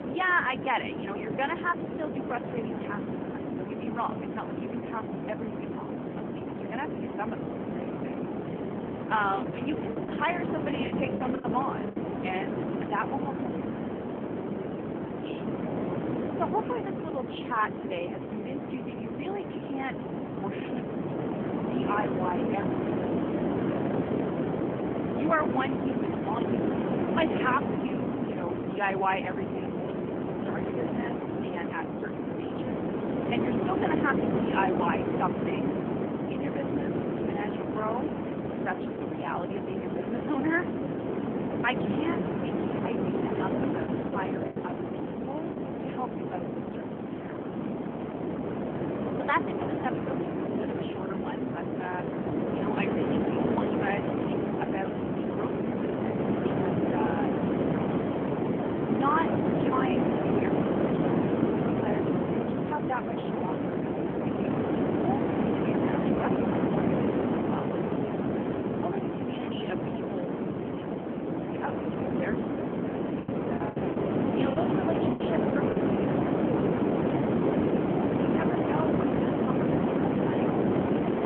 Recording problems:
phone-call audio; nothing above 3 kHz
wind noise on the microphone; heavy; 1 dB above the speech
choppy; very; from 10 to 12 s, at 44 s and from 1:13 to 1:16; 11% of the speech affected

